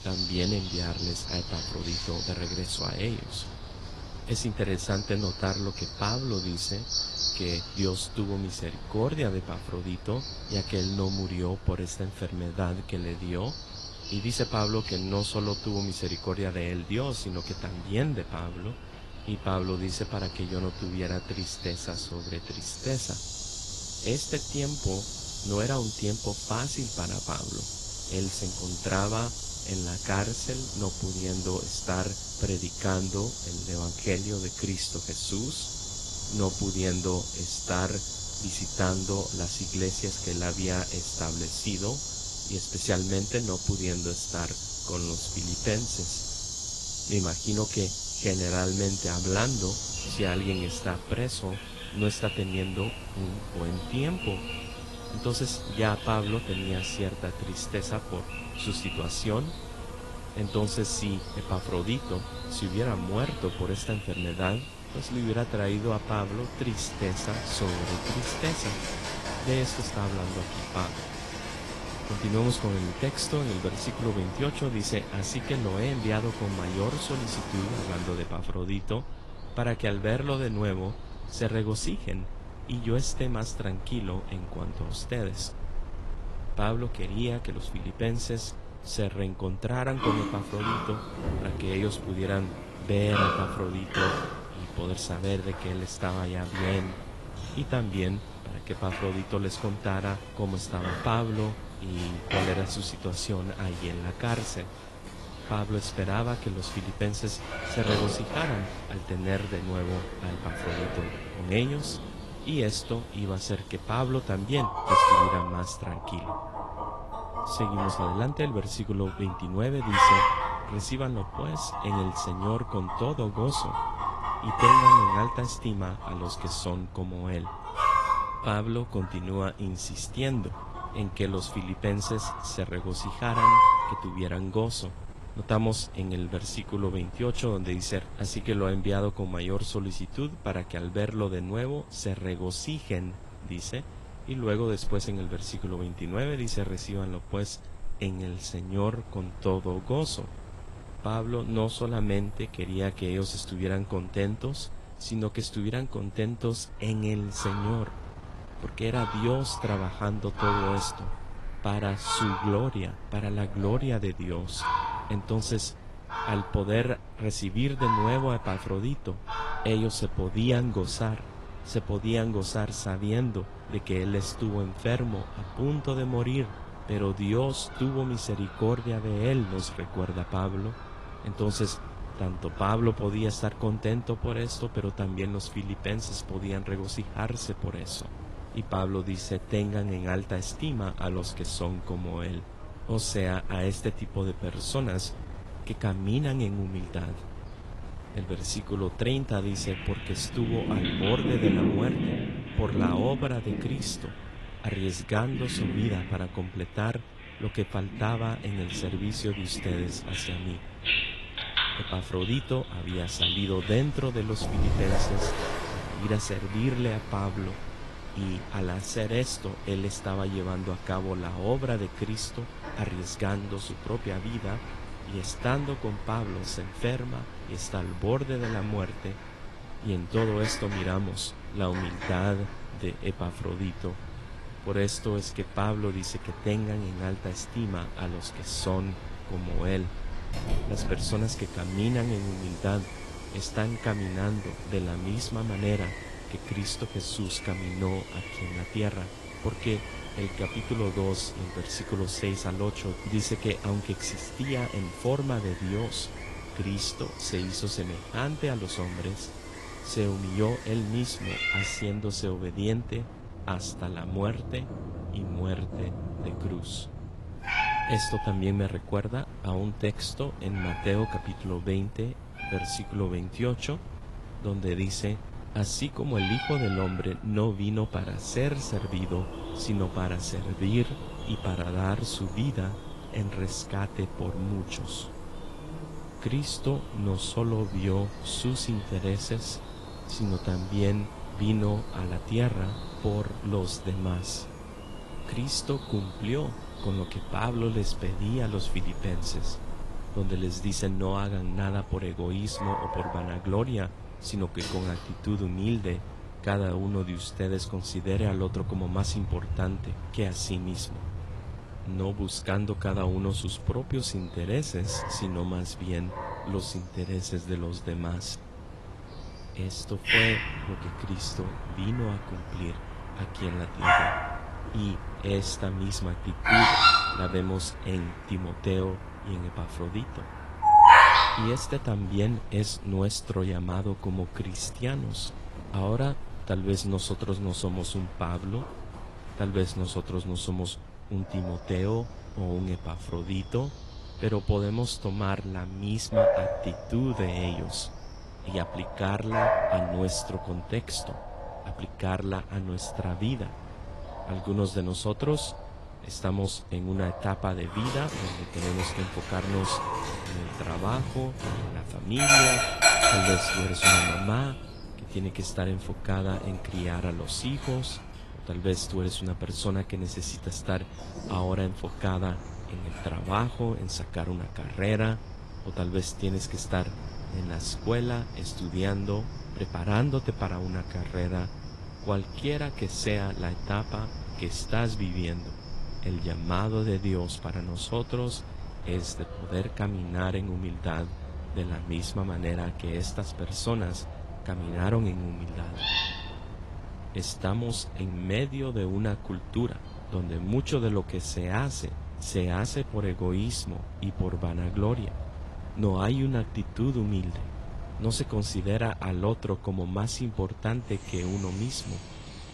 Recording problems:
garbled, watery; slightly; nothing above 11 kHz
animal sounds; loud; throughout; as loud as the speech
wind noise on the microphone; occasional gusts; 15 dB below the speech

